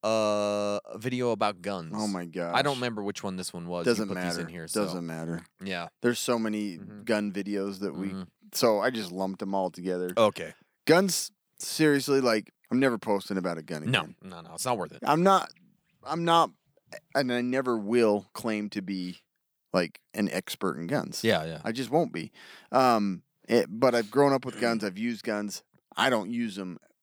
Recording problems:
none

